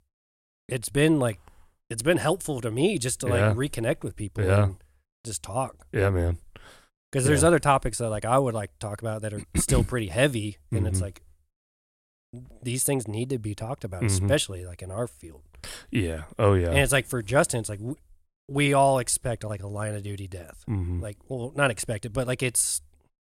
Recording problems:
none

